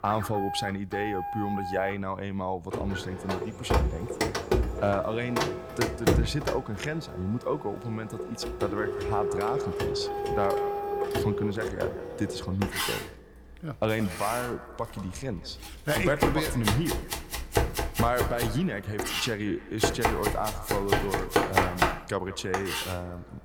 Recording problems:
echo of what is said; noticeable; from 8.5 s on; 170 ms later, 15 dB below the speech
household noises; very loud; throughout; 1 dB above the speech

